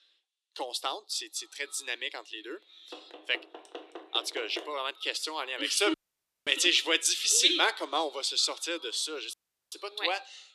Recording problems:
thin; very; fading below 300 Hz
echo of what is said; faint; throughout; 260 ms later, 25 dB below the speech
door banging; faint; from 3 to 4.5 s; peak 15 dB below the speech
audio cutting out; at 6 s for 0.5 s and at 9.5 s

